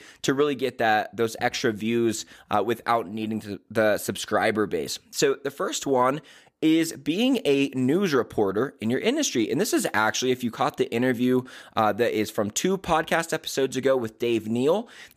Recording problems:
none

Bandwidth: 15 kHz